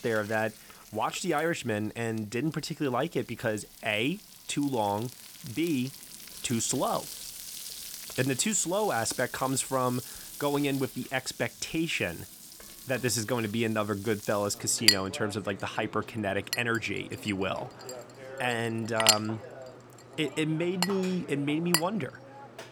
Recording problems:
household noises; loud; throughout; 3 dB below the speech

